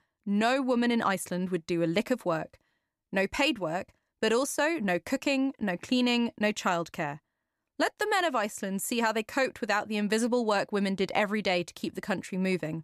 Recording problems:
none

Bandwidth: 14 kHz